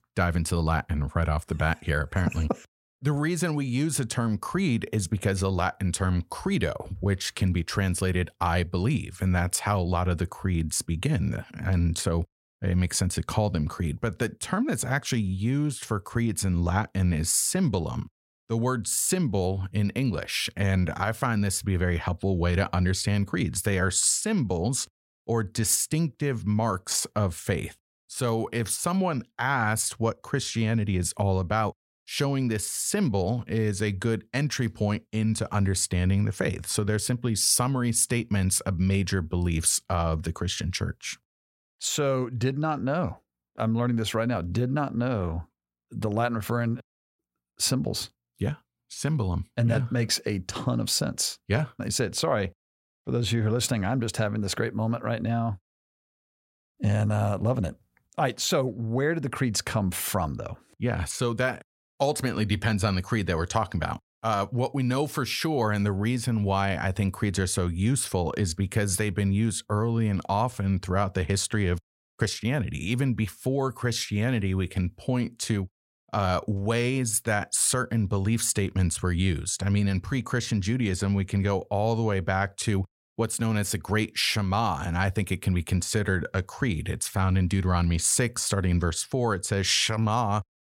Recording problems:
none

